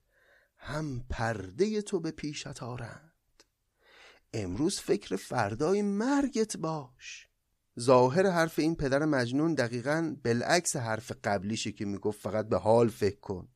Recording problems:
none

